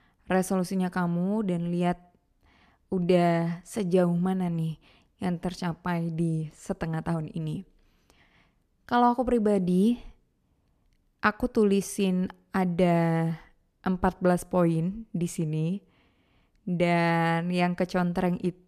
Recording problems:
none

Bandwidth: 14.5 kHz